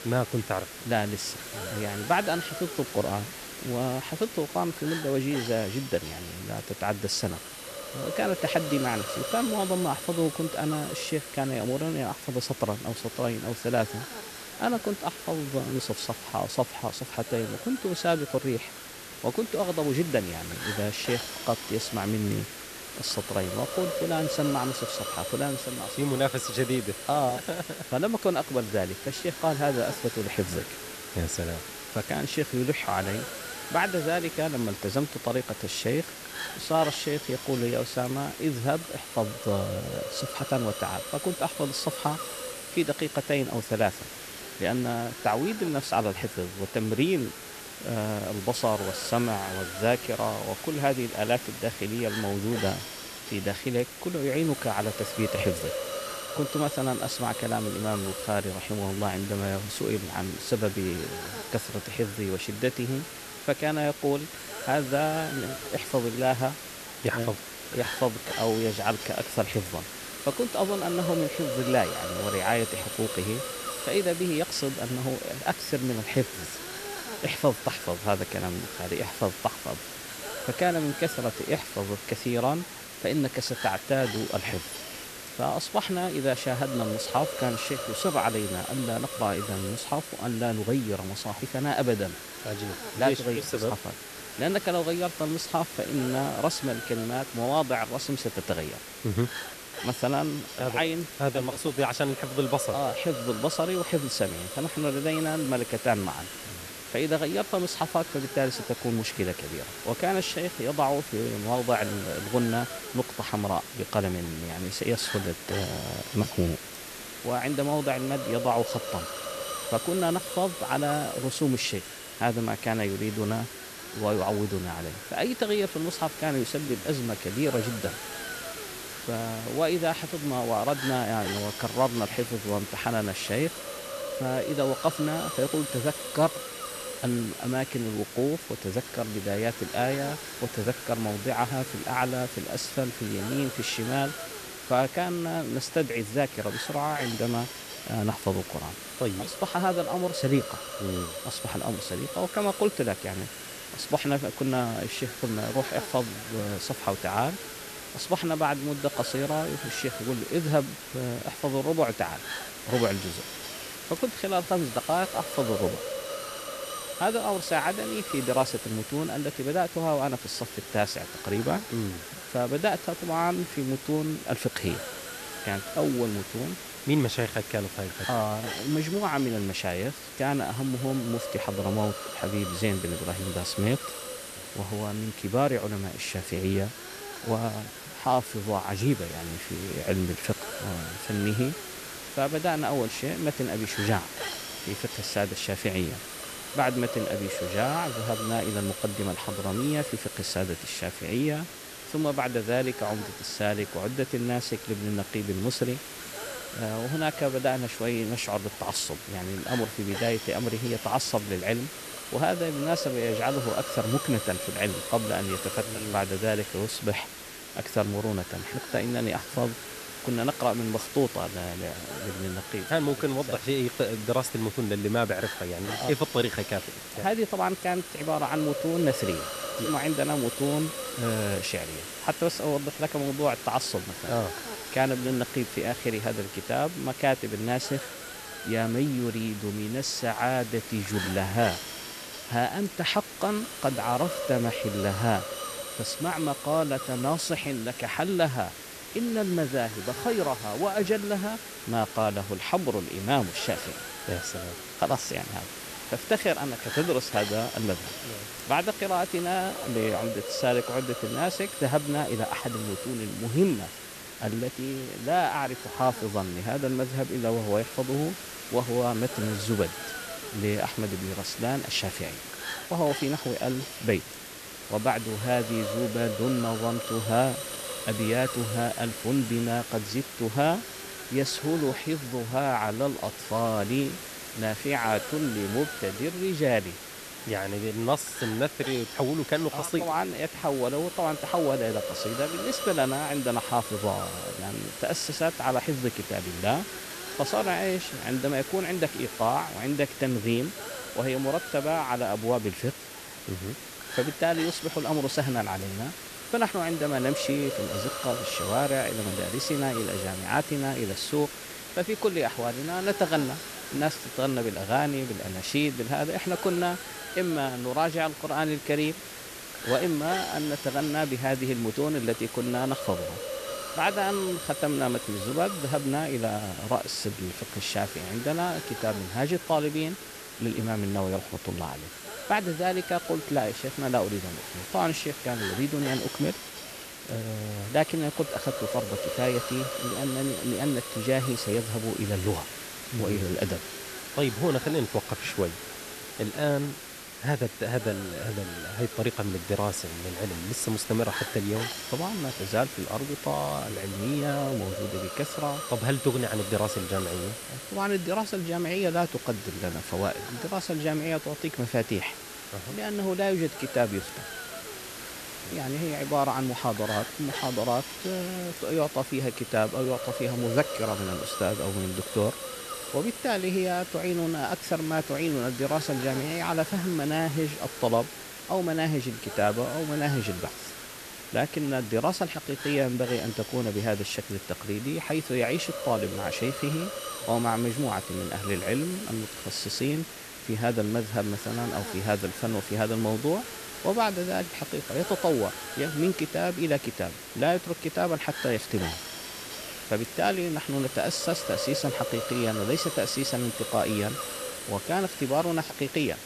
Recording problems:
hiss; loud; throughout; 7 dB below the speech

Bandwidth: 14 kHz